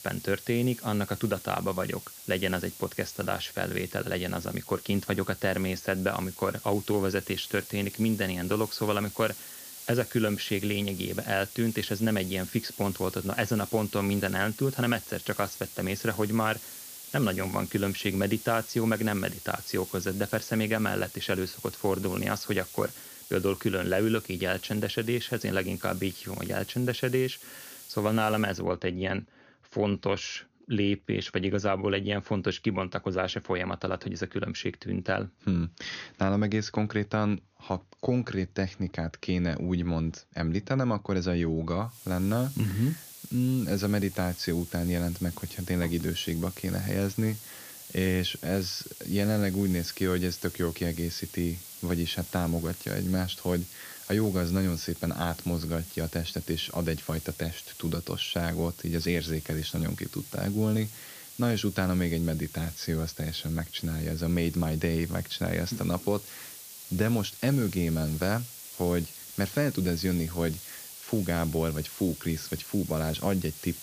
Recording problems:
high frequencies cut off; noticeable; nothing above 6.5 kHz
hiss; noticeable; until 29 s and from 42 s on; 10 dB below the speech

